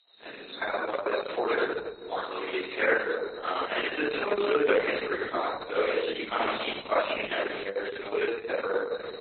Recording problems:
room echo; strong; dies away in 1.7 s
off-mic speech; far
garbled, watery; badly; nothing above 4 kHz
thin; very; fading below 350 Hz
high-pitched whine; faint; throughout; 4 kHz, 20 dB below the speech
uneven, jittery; strongly; from 0.5 to 8.5 s

